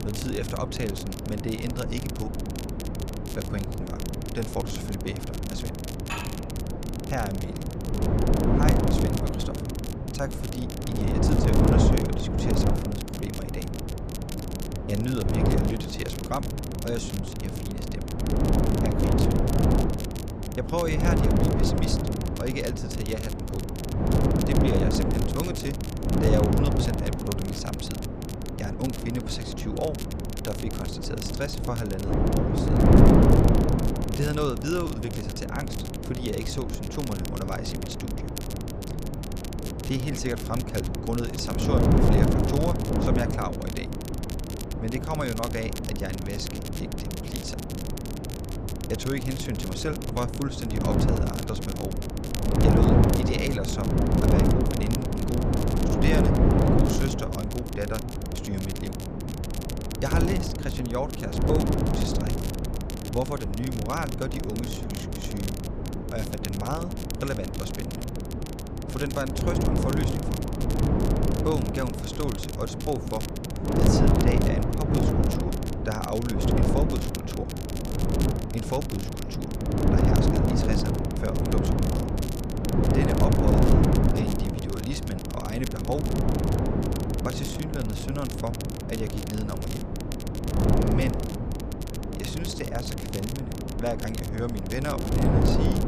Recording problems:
wind noise on the microphone; heavy; 2 dB above the speech
crackle, like an old record; loud; 9 dB below the speech
clattering dishes; noticeable; at 6 s; peak 2 dB below the speech

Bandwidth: 14.5 kHz